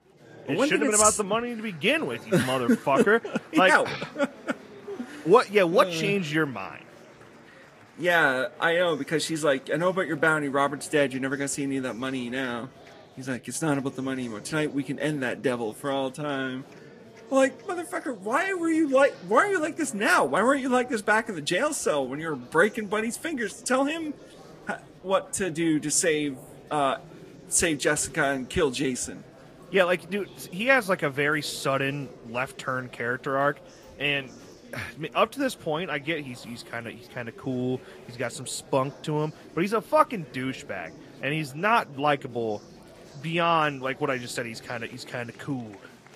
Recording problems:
garbled, watery; slightly
murmuring crowd; faint; throughout; 20 dB below the speech

